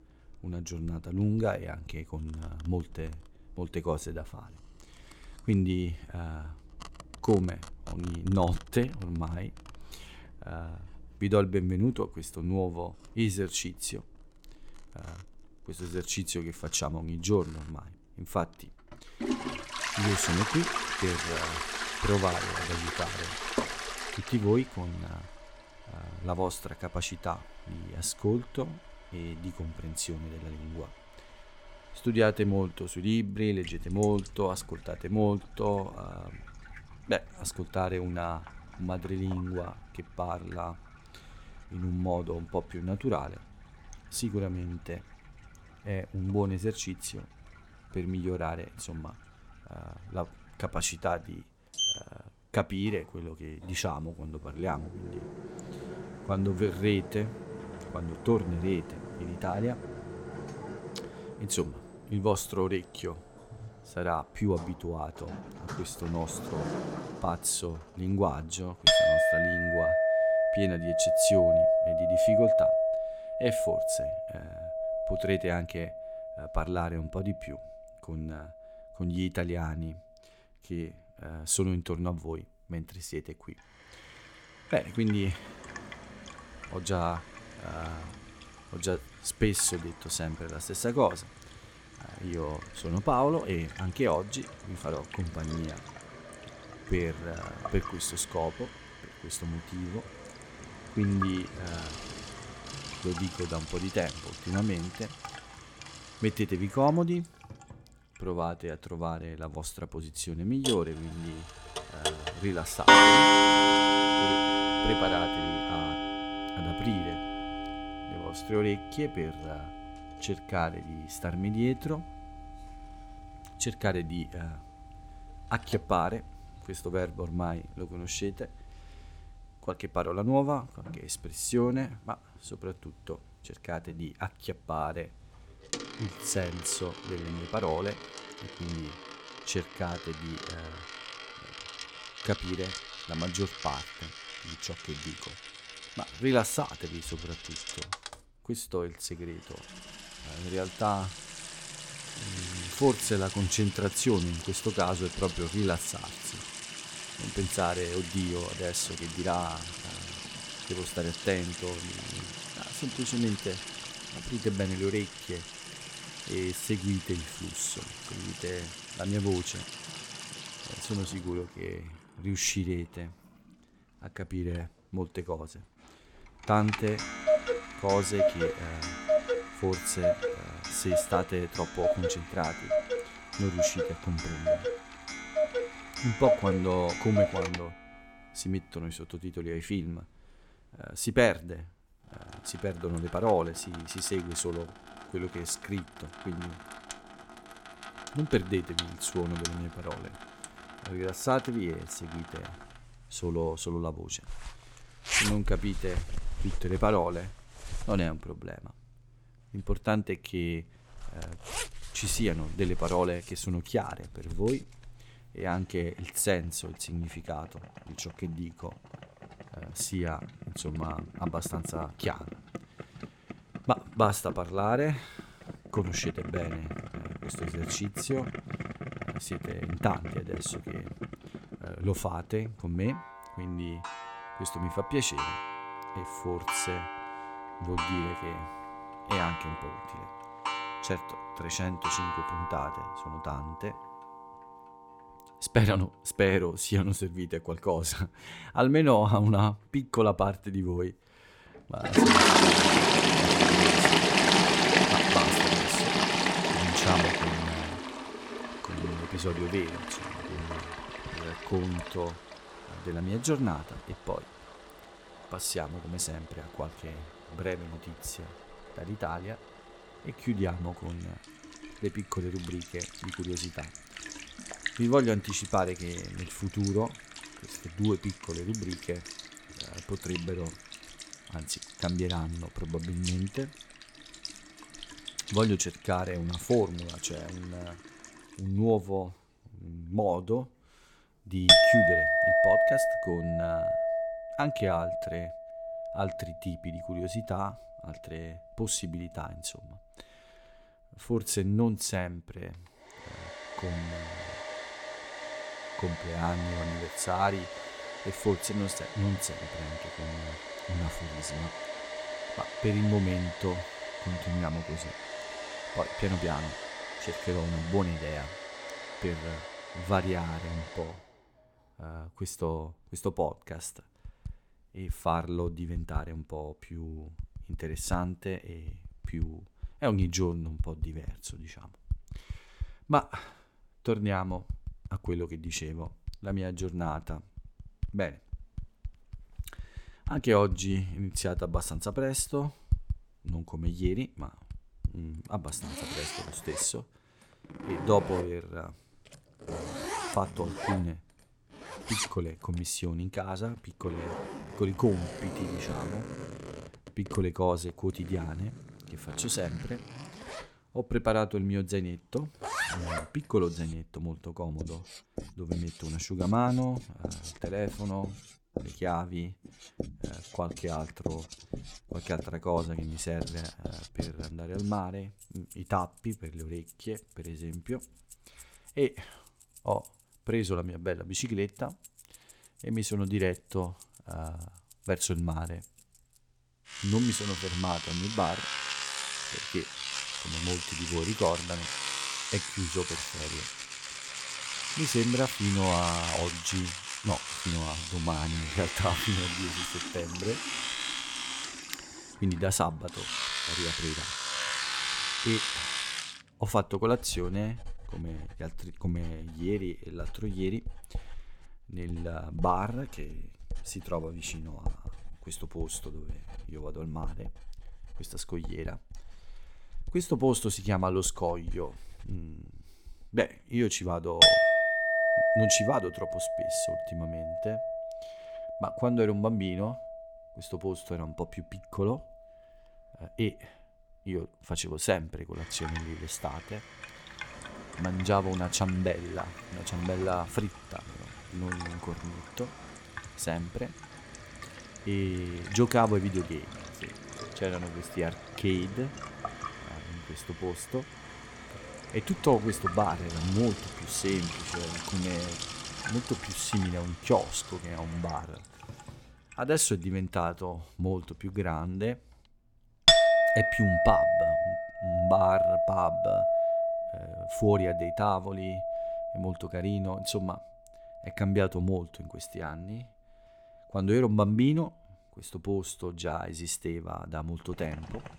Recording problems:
household noises; very loud; throughout; 1 dB above the speech

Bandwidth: 17.5 kHz